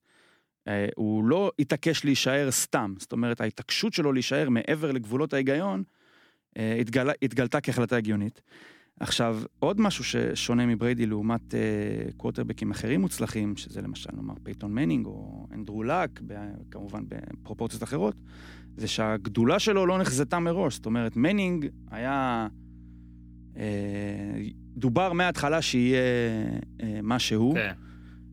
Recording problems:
electrical hum; faint; from 9.5 s on; 60 Hz, 30 dB below the speech

